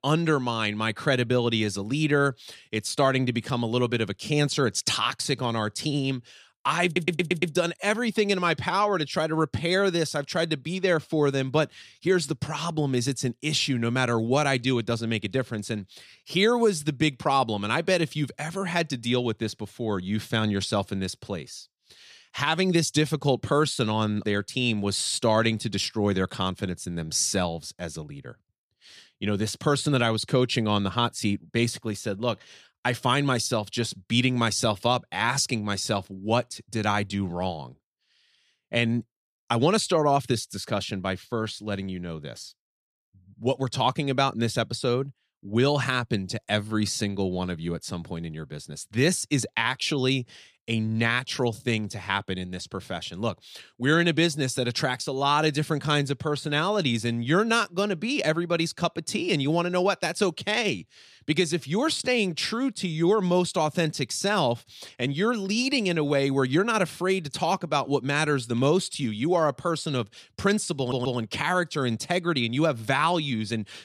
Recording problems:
audio stuttering; at 7 s and at 1:11

